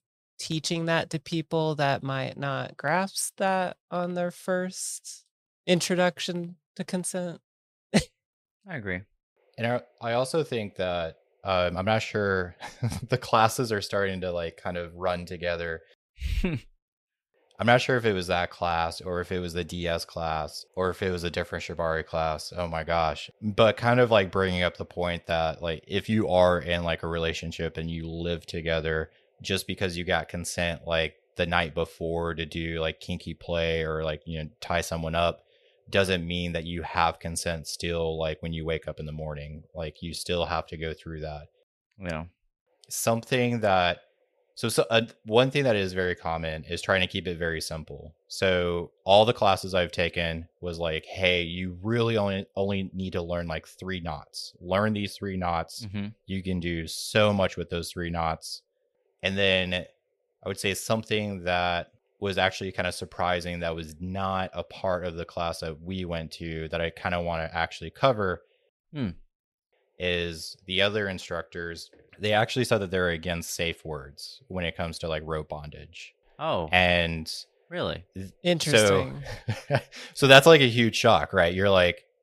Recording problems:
none

